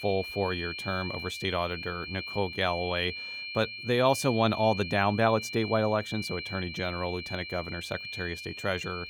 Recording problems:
high-pitched whine; loud; throughout; 2.5 kHz, 7 dB below the speech

